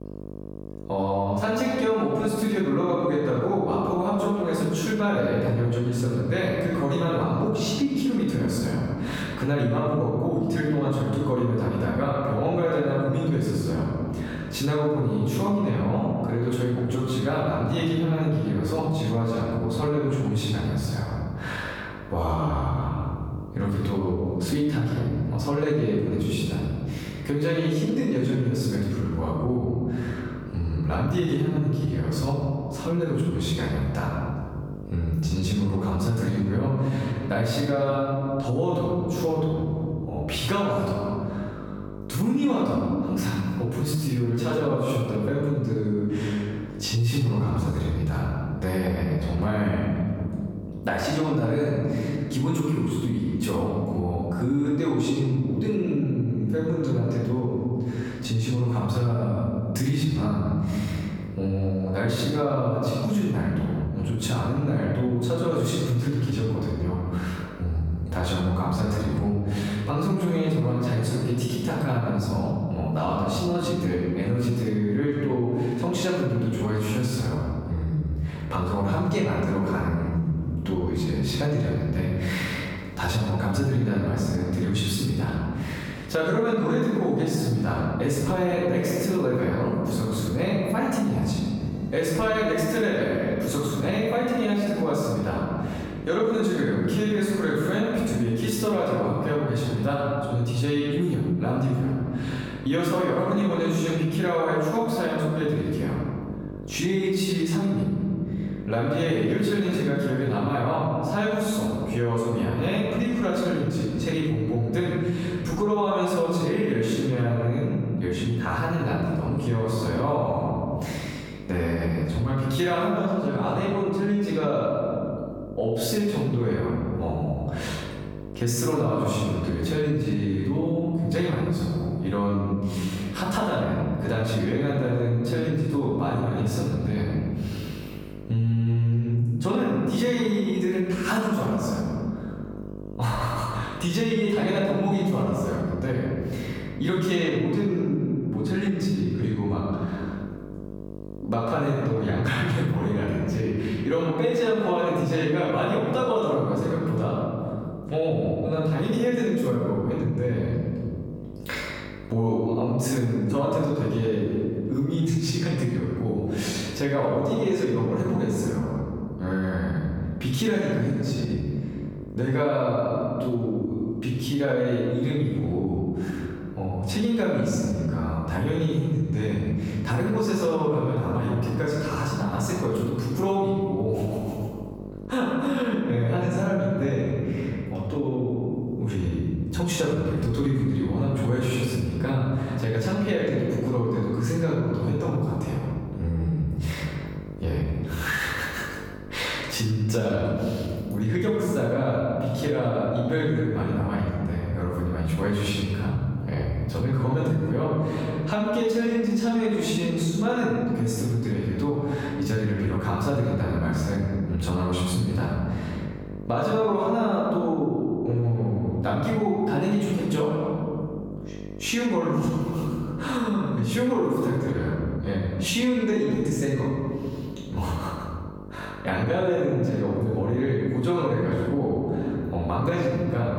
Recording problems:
off-mic speech; far
room echo; noticeable; dies away in 1.4 s
squashed, flat; somewhat
electrical hum; faint; throughout; 50 Hz, 20 dB below the speech

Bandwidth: 18 kHz